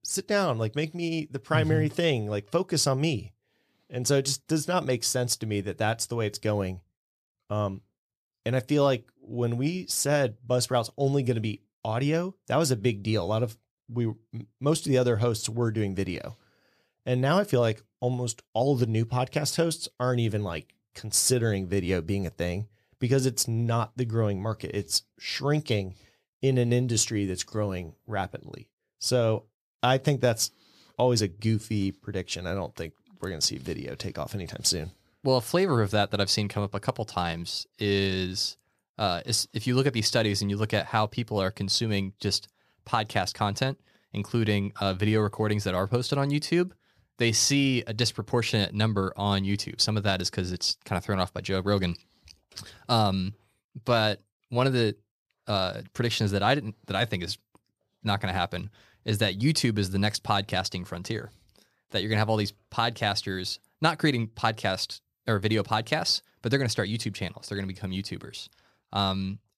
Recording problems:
none

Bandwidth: 13.5 kHz